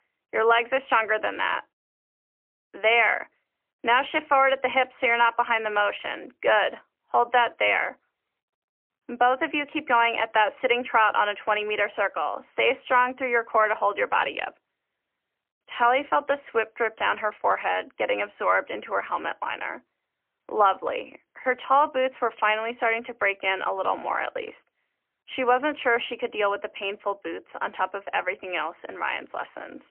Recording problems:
phone-call audio; poor line; nothing above 3 kHz

